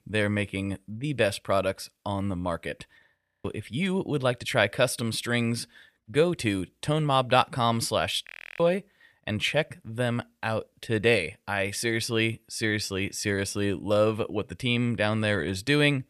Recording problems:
audio freezing; at 3 s and at 8.5 s

